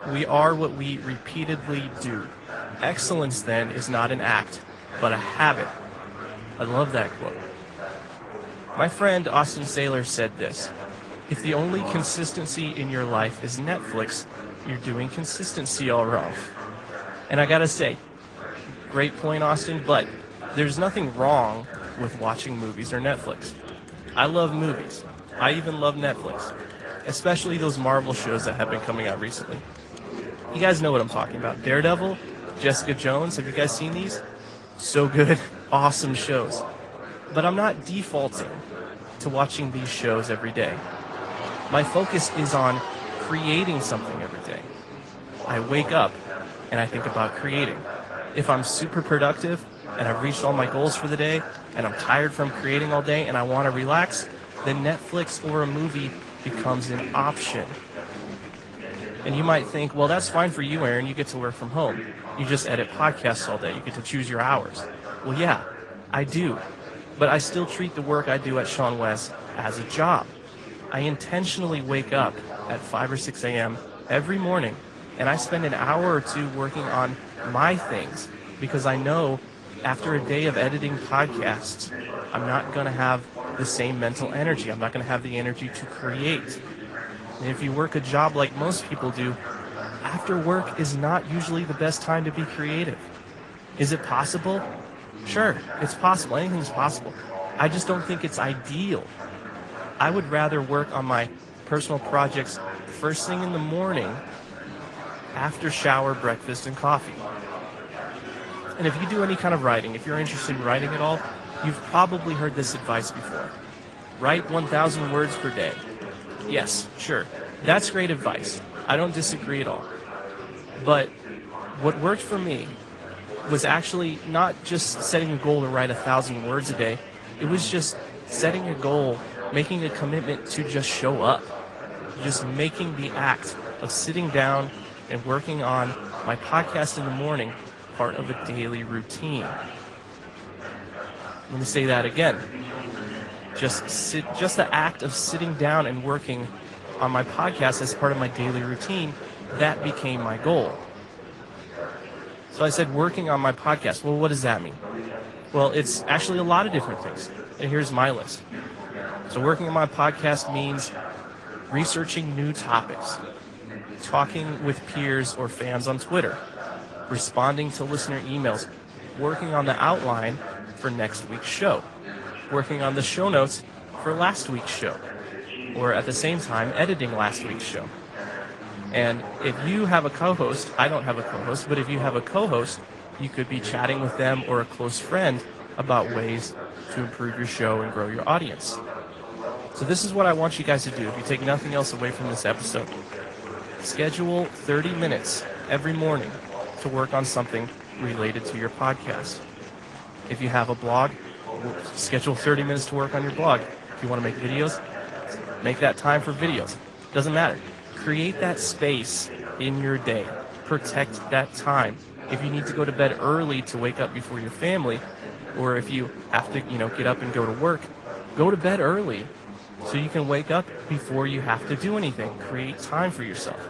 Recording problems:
garbled, watery; slightly; nothing above 10 kHz
chatter from many people; noticeable; throughout; 10 dB below the speech

